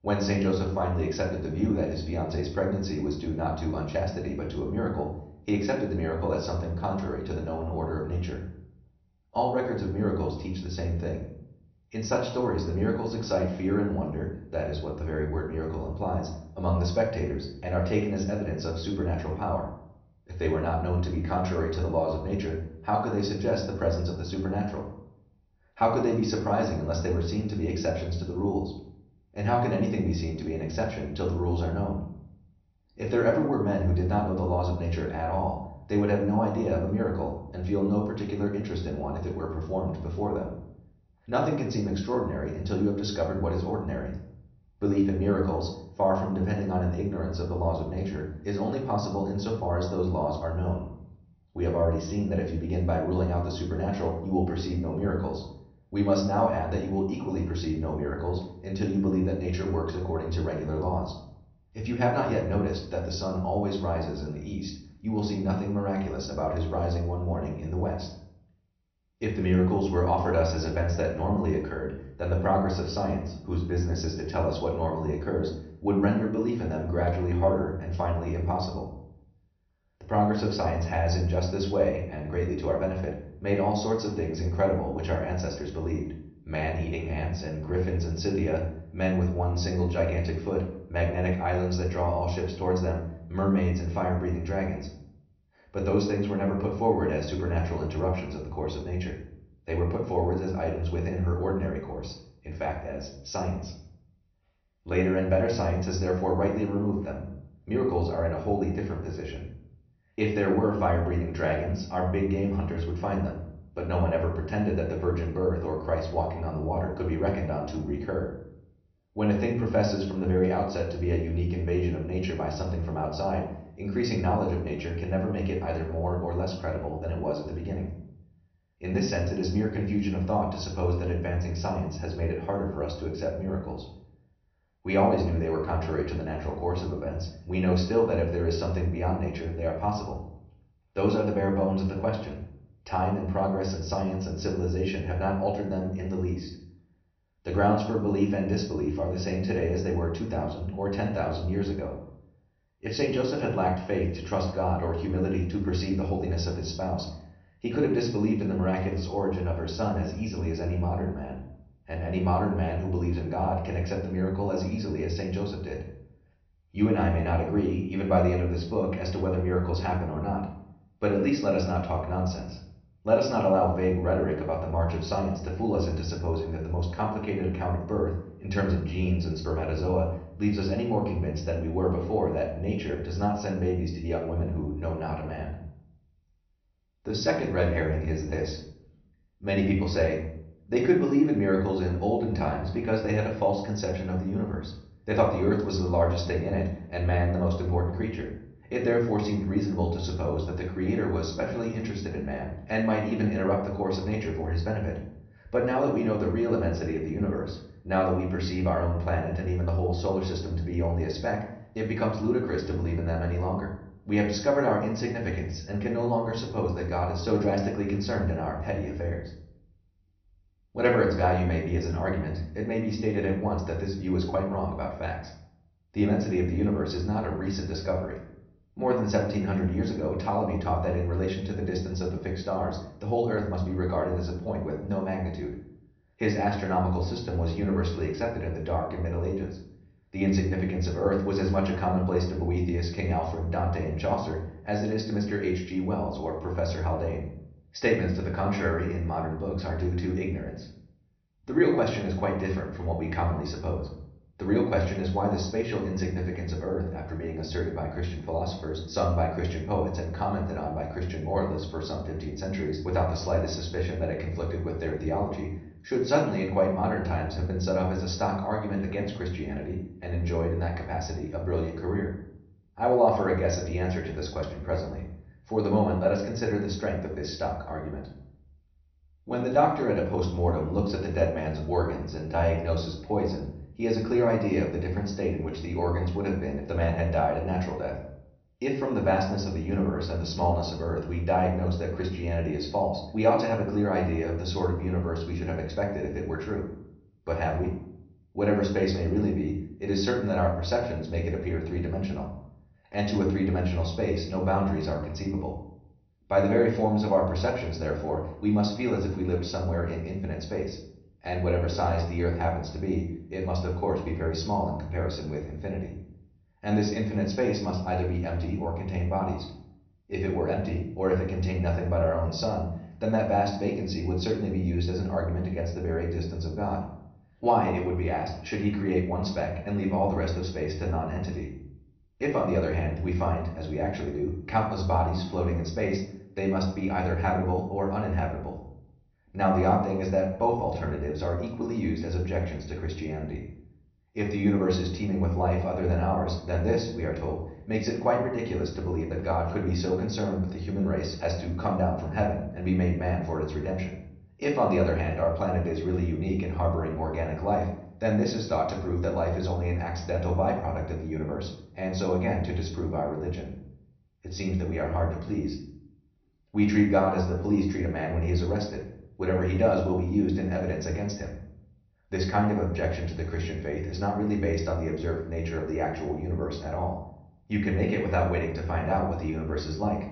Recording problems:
off-mic speech; far
room echo; noticeable; dies away in 0.6 s
high frequencies cut off; noticeable; nothing above 6 kHz

